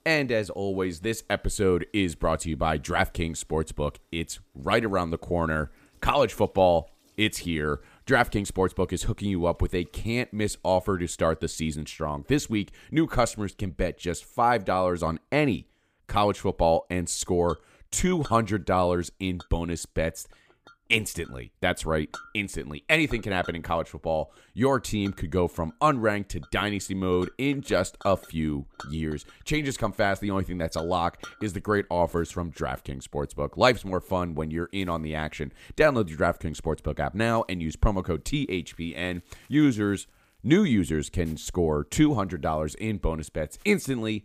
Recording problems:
household noises; faint; throughout; 25 dB below the speech

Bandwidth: 15 kHz